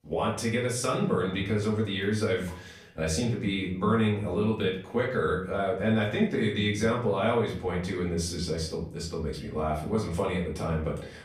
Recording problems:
off-mic speech; far
room echo; slight; dies away in 0.5 s

